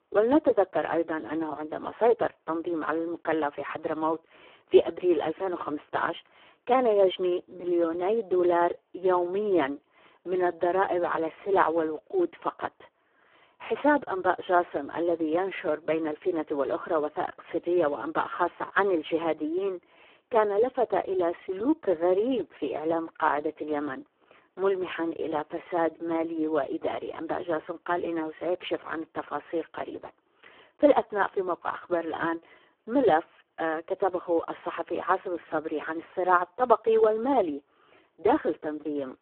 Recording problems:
phone-call audio; poor line

